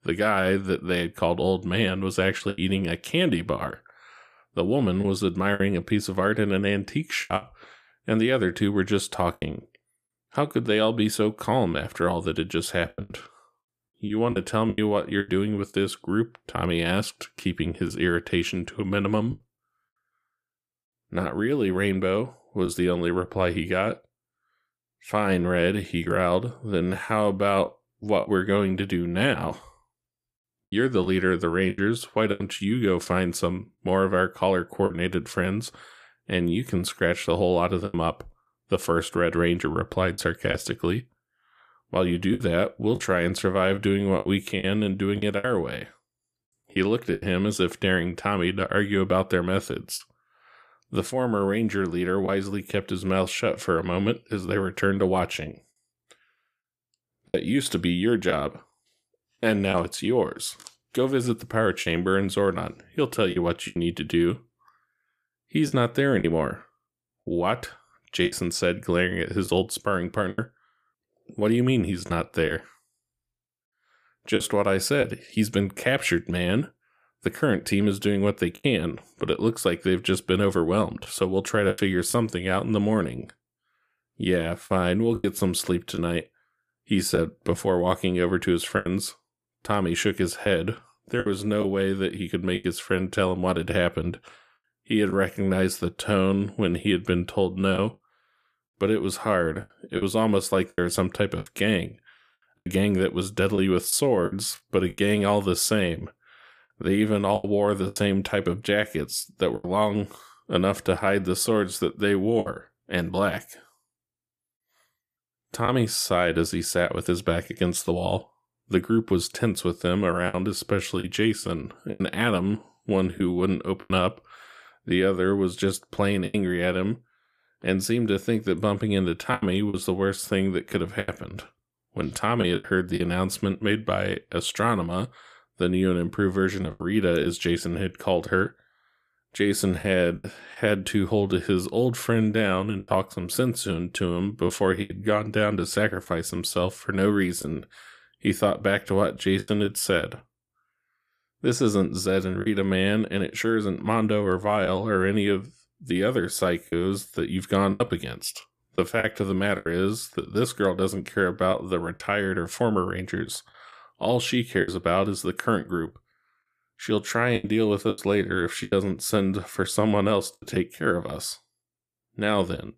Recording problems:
choppy; occasionally; 4% of the speech affected

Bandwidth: 14.5 kHz